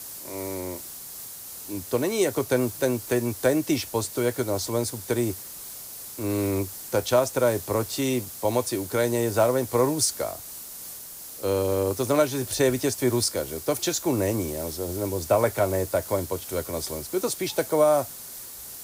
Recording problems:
hiss; noticeable; throughout; 10 dB below the speech

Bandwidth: 15.5 kHz